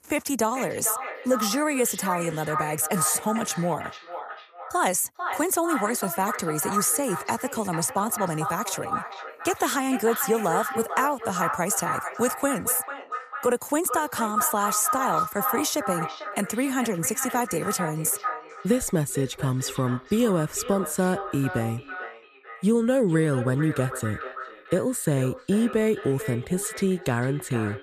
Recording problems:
echo of what is said; strong; throughout; 450 ms later, 8 dB below the speech

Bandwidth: 14.5 kHz